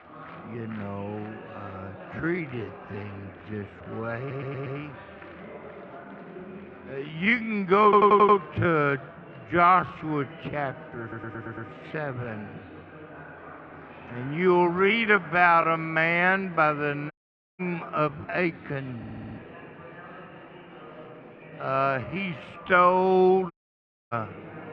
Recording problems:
muffled; very; fading above 3 kHz
wrong speed, natural pitch; too slow; 0.6 times normal speed
murmuring crowd; noticeable; throughout; 20 dB below the speech
audio stuttering; 4 times, first at 4 s
audio cutting out; at 17 s and at 24 s for 0.5 s

